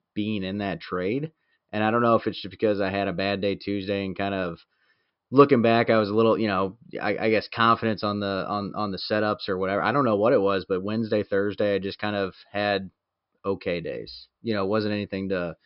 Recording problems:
high frequencies cut off; noticeable; nothing above 5.5 kHz

